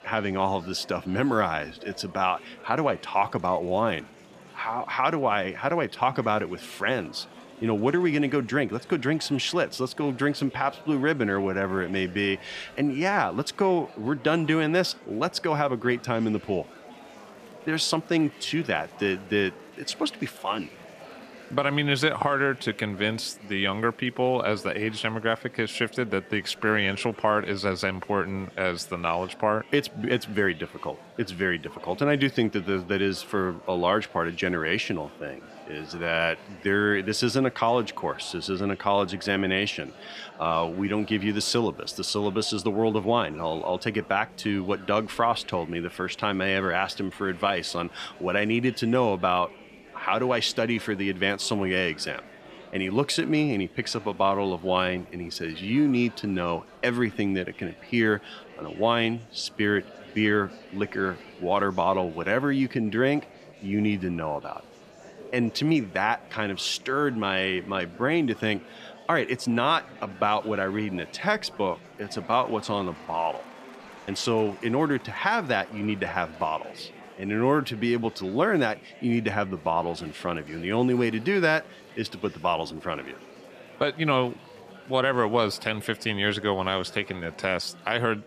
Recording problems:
murmuring crowd; faint; throughout; 20 dB below the speech

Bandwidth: 14.5 kHz